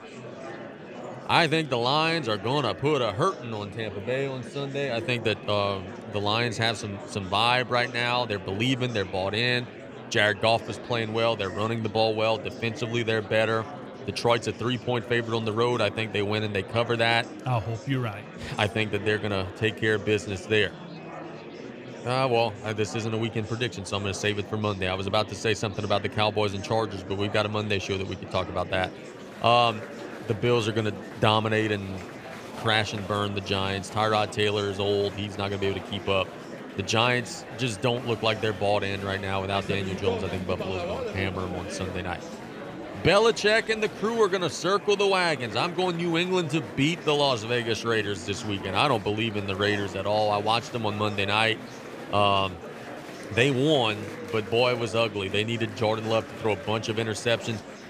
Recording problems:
murmuring crowd; noticeable; throughout; 15 dB below the speech

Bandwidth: 15 kHz